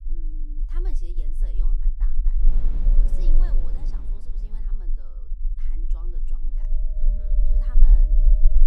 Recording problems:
wind noise on the microphone; heavy; from 2.5 to 4.5 s and from 6 s on; 2 dB above the speech
low rumble; loud; throughout; as loud as the speech

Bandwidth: 15.5 kHz